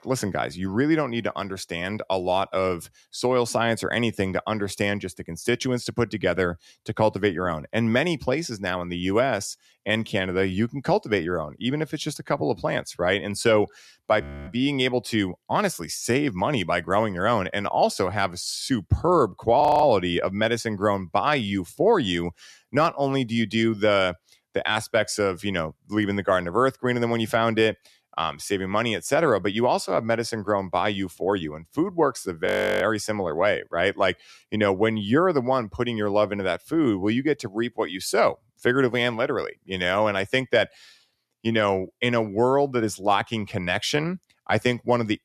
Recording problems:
audio freezing; at 14 s, at 20 s and at 32 s

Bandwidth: 13.5 kHz